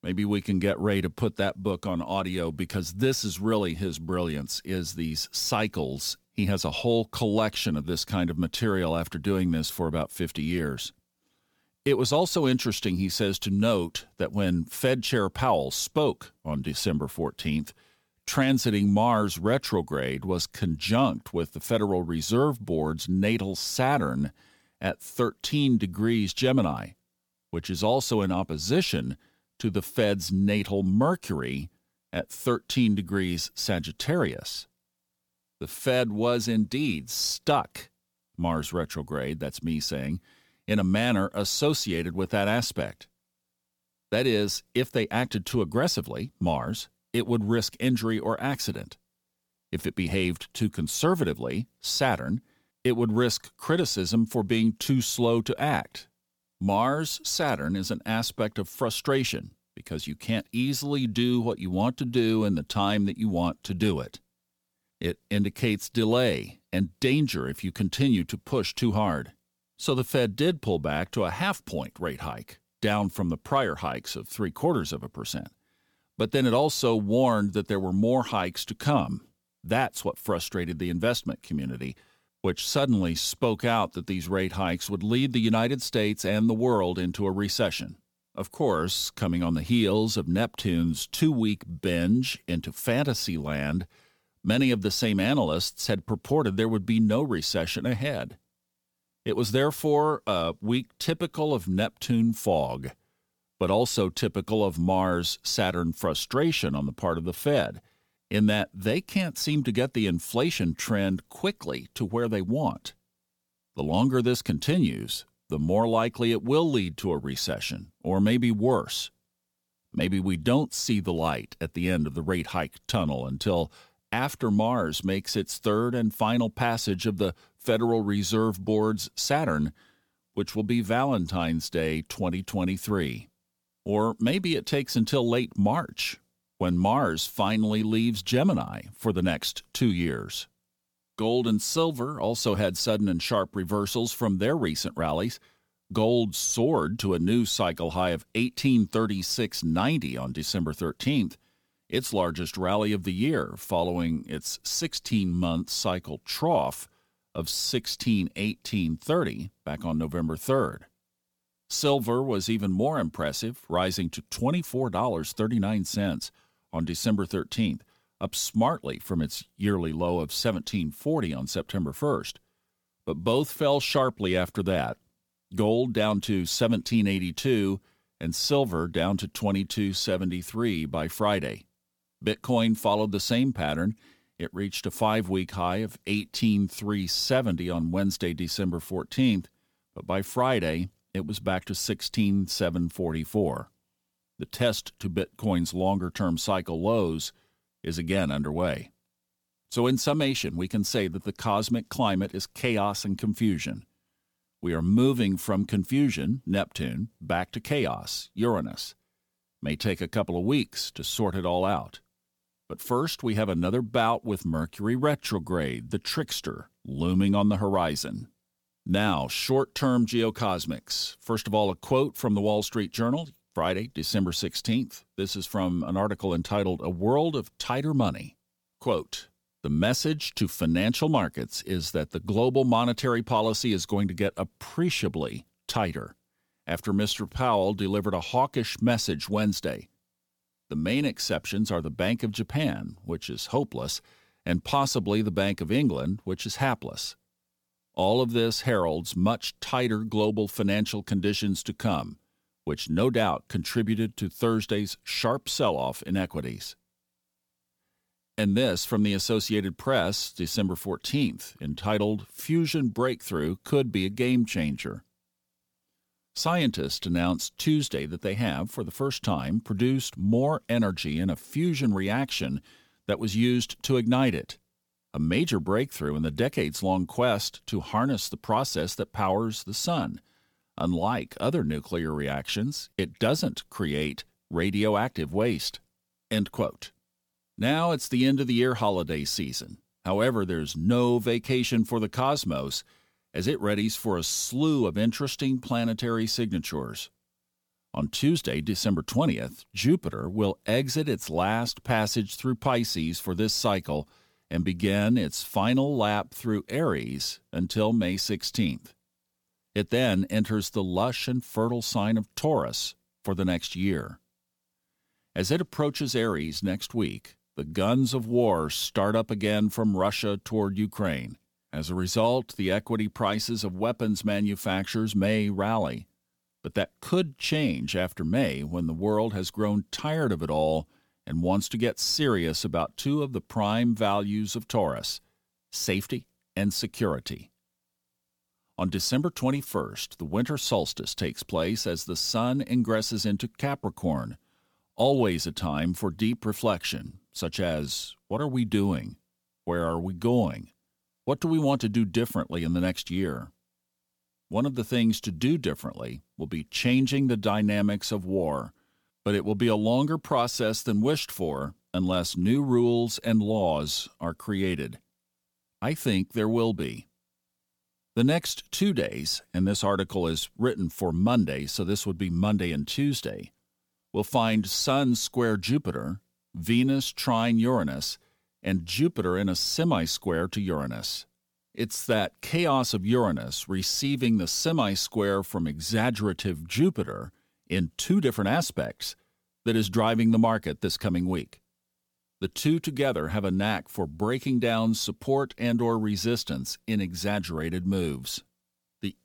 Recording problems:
none

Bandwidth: 18.5 kHz